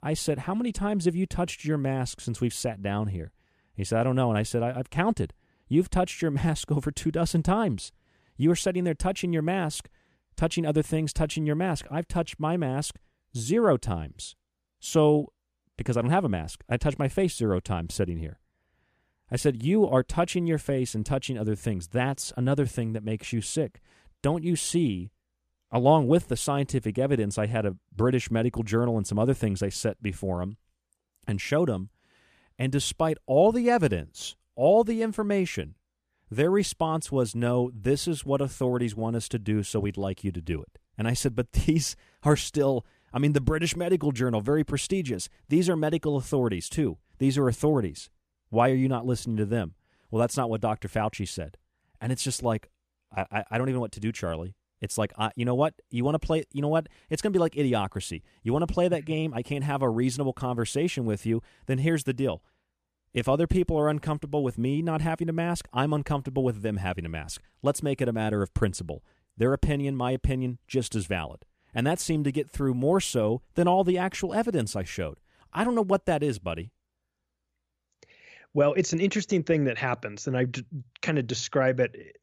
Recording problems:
none

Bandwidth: 14.5 kHz